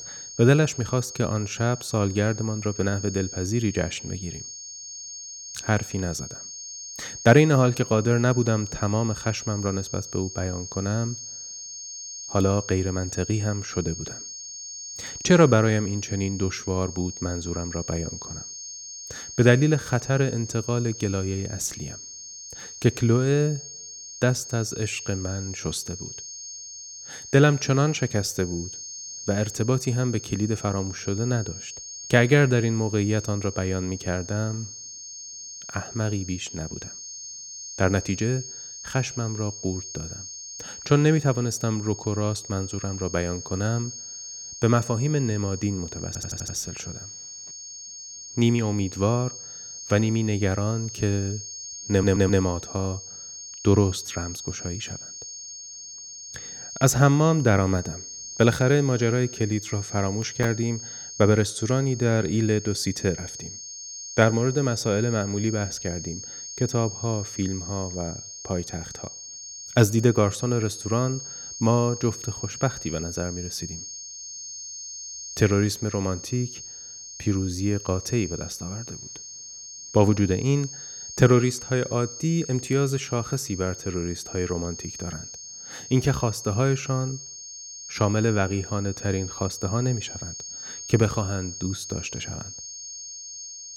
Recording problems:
high-pitched whine; noticeable; throughout; 6.5 kHz, 10 dB below the speech
audio stuttering; at 46 s and at 52 s

